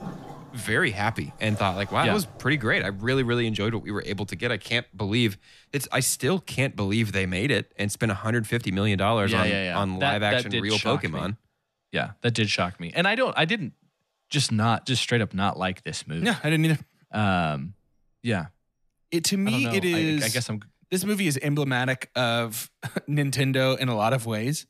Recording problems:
rain or running water; faint; throughout; 20 dB below the speech

